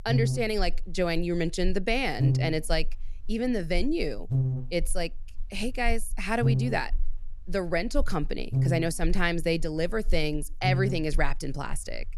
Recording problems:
electrical hum; loud; throughout; 50 Hz, 10 dB below the speech

